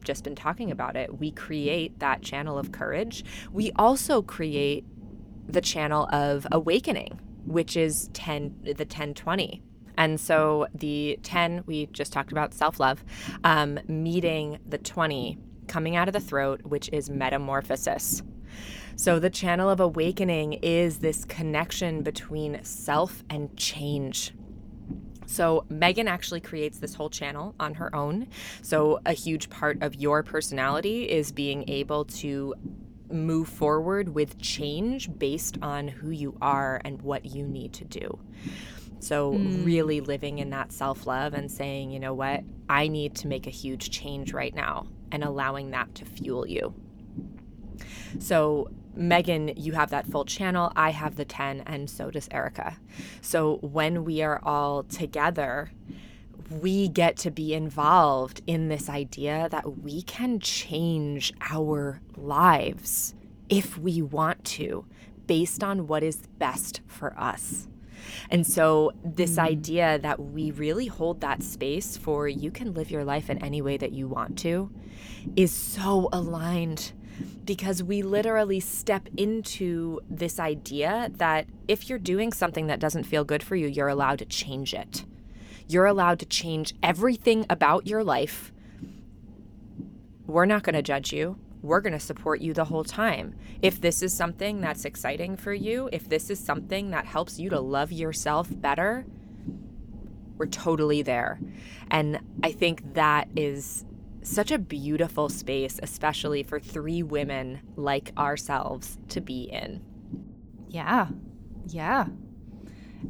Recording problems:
low rumble; faint; throughout; 25 dB below the speech

